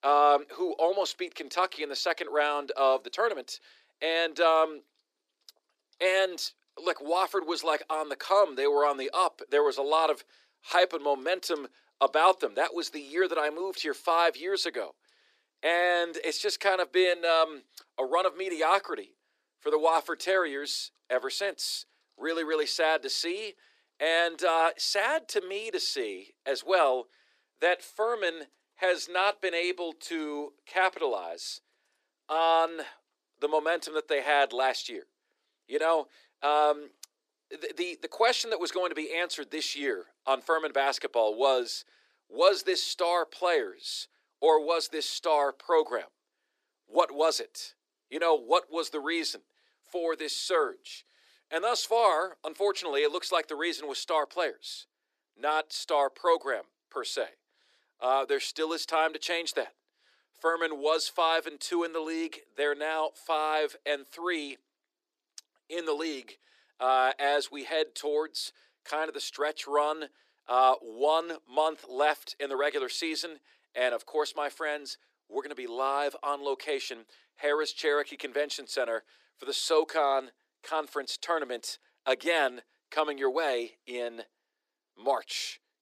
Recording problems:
thin; very; fading below 350 Hz

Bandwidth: 14.5 kHz